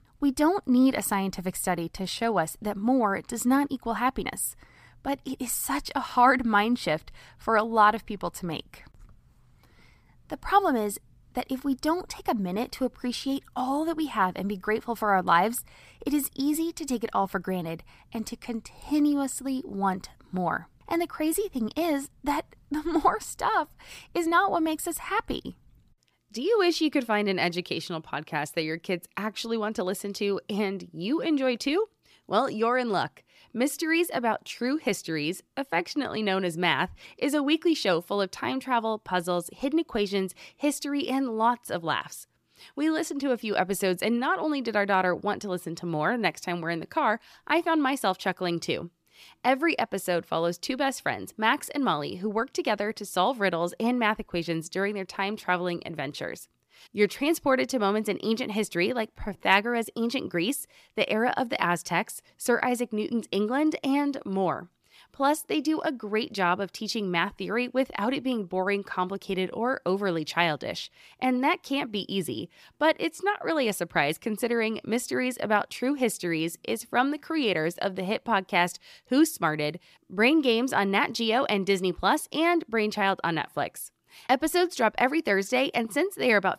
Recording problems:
uneven, jittery; slightly; from 2 s to 1:13

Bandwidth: 15 kHz